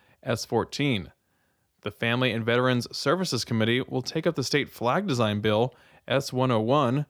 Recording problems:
none

